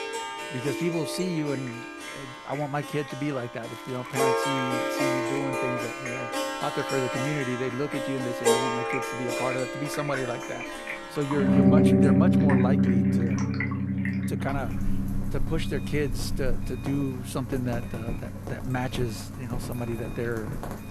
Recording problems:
background music; very loud; throughout; 5 dB above the speech
rain or running water; loud; throughout; 8 dB below the speech
alarms or sirens; noticeable; from 8.5 s on; 20 dB below the speech
background chatter; faint; throughout; 3 voices, 30 dB below the speech
crackling; faint; from 3.5 to 5.5 s; 20 dB below the speech

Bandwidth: 13.5 kHz